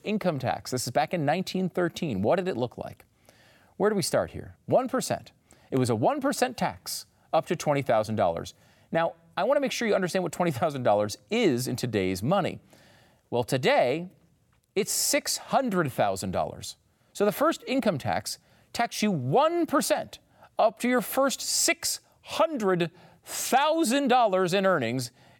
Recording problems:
none

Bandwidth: 17 kHz